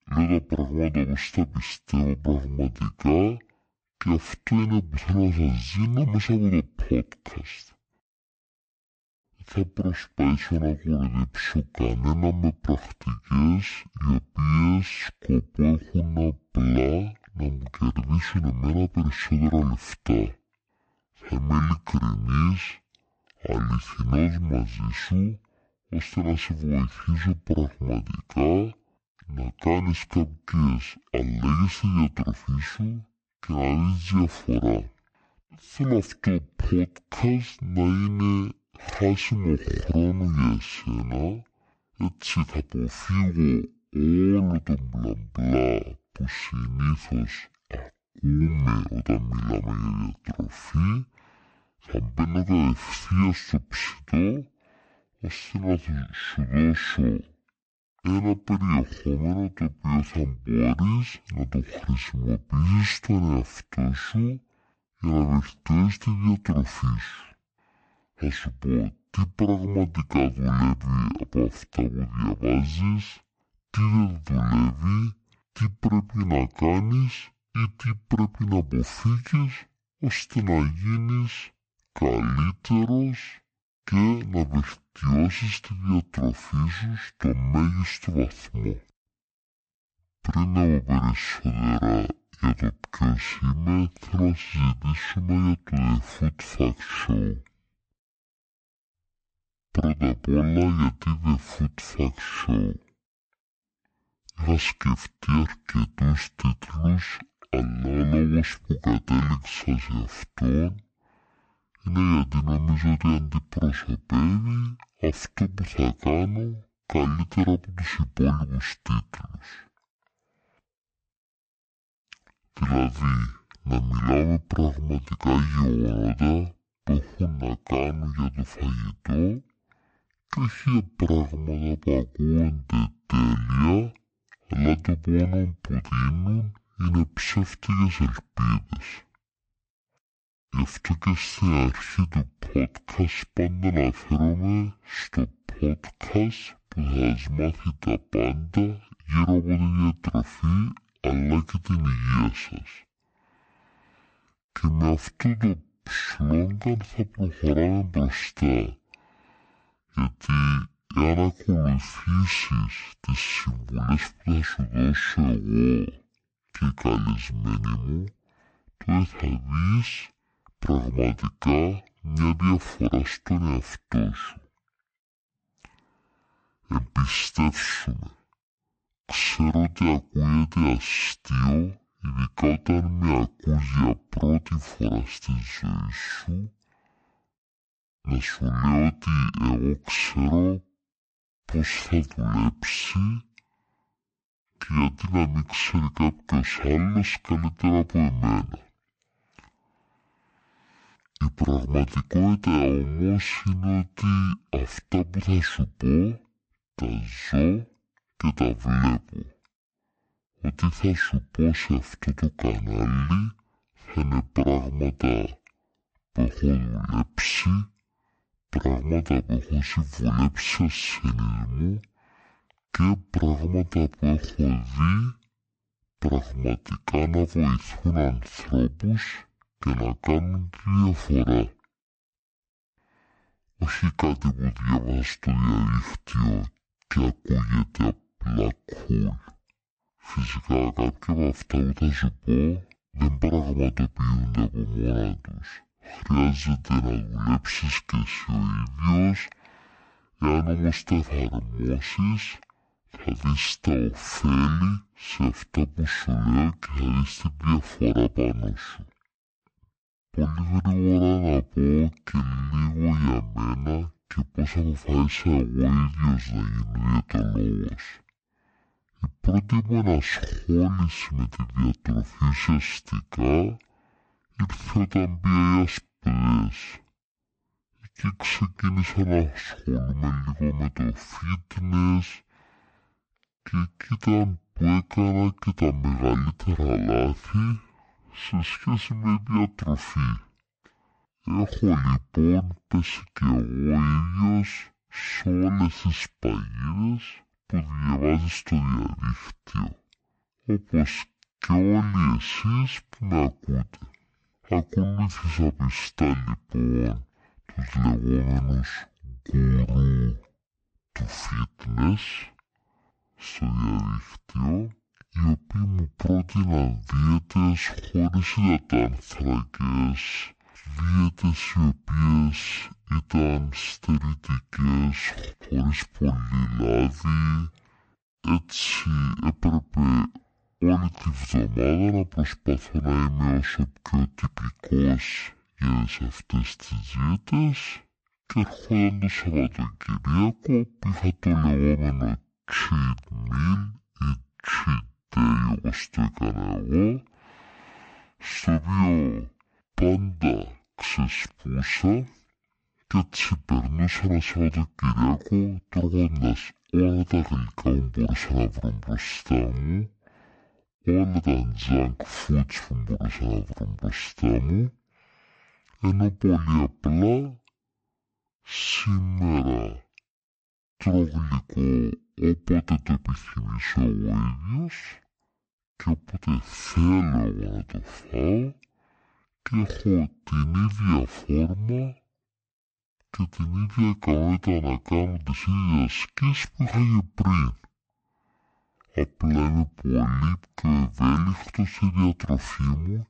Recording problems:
wrong speed and pitch; too slow and too low; 0.5 times normal speed

